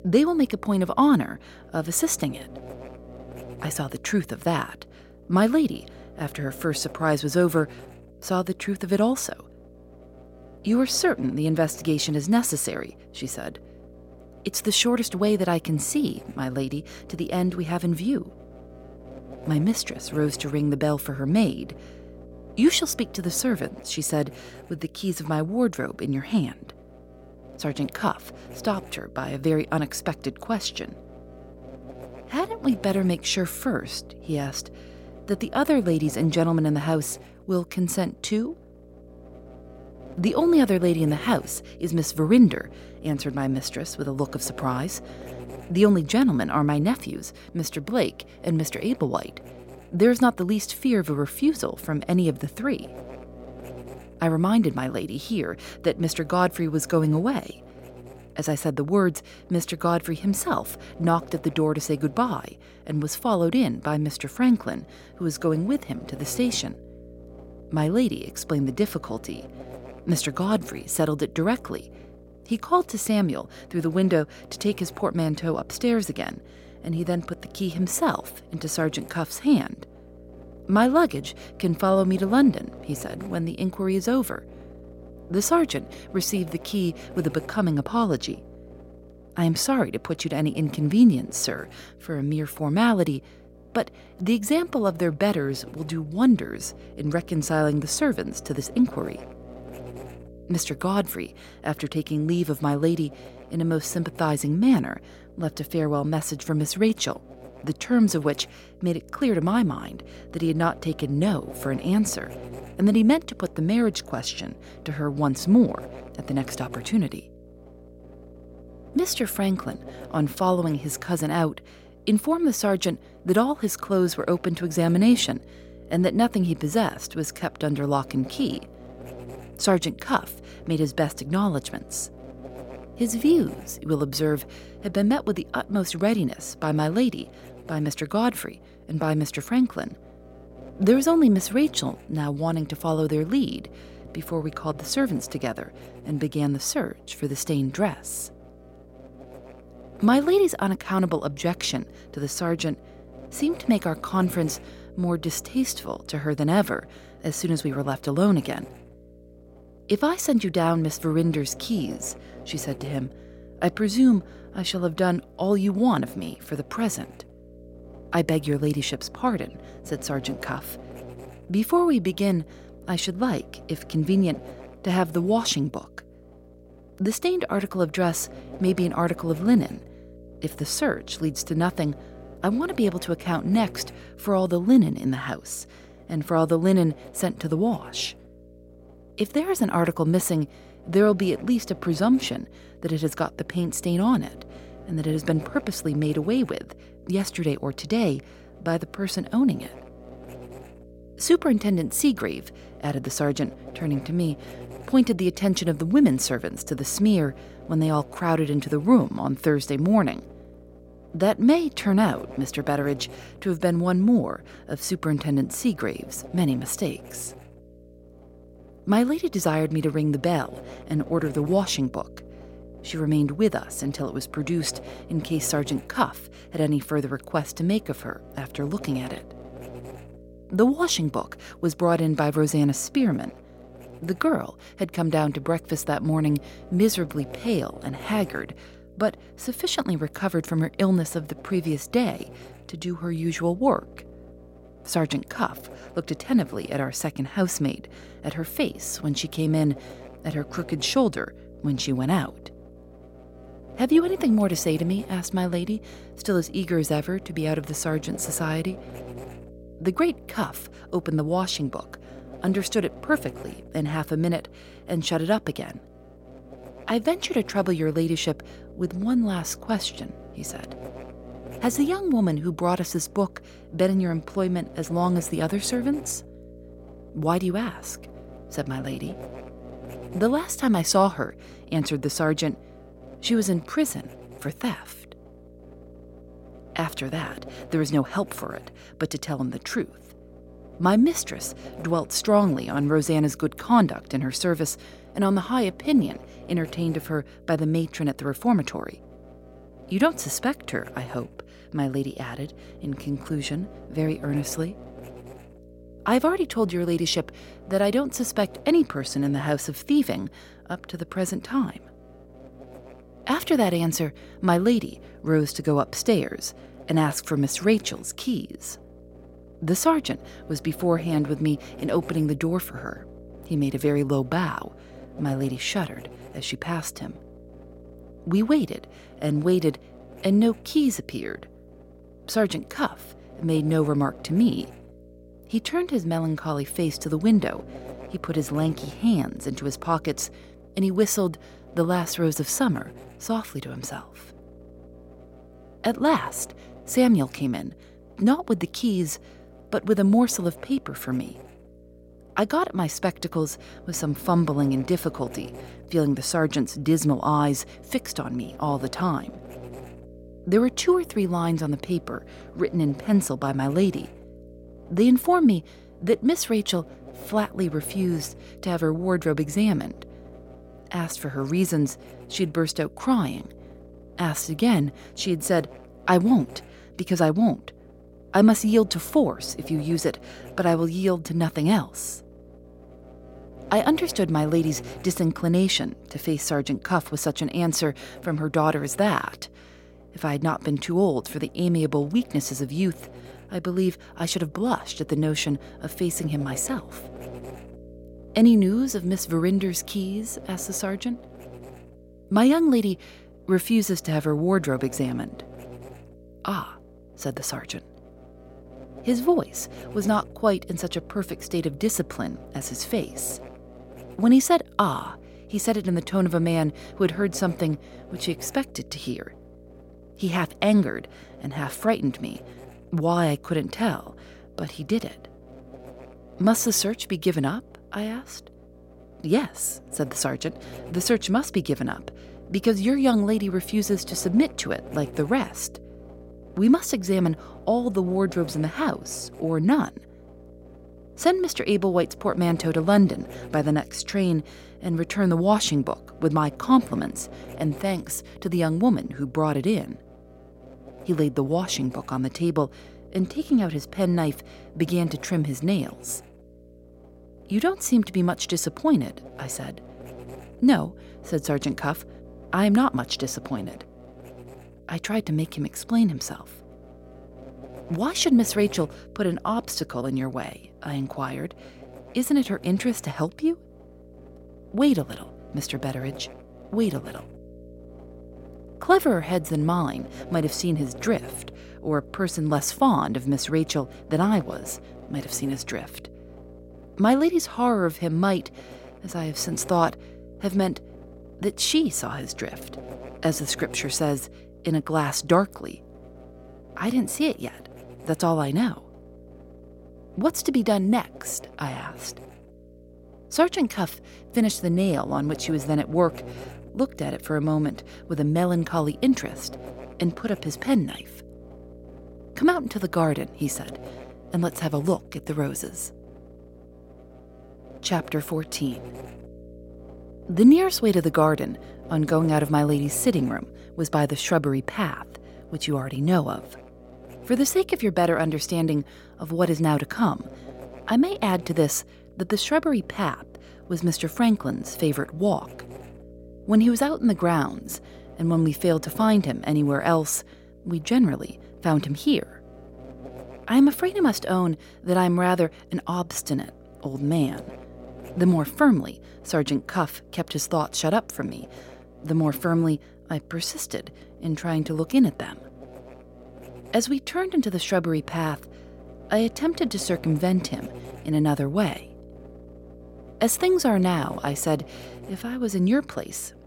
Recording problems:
electrical hum; noticeable; throughout; 60 Hz, 20 dB below the speech

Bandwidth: 16.5 kHz